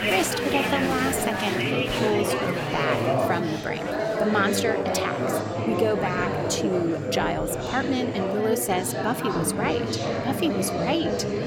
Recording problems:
chatter from many people; very loud; throughout; 1 dB above the speech

